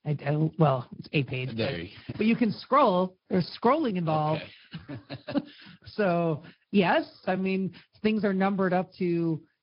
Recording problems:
high frequencies cut off; noticeable; nothing above 5 kHz
garbled, watery; slightly
uneven, jittery; strongly; from 1 to 8.5 s

